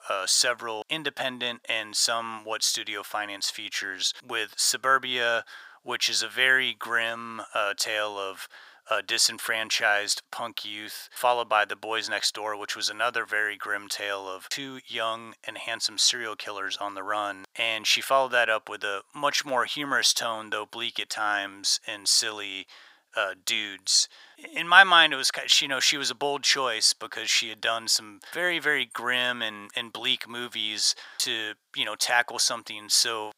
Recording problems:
thin; very; fading below 800 Hz

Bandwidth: 15.5 kHz